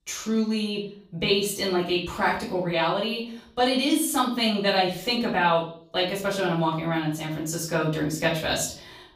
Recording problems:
off-mic speech; far
room echo; slight; dies away in 0.5 s

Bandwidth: 15 kHz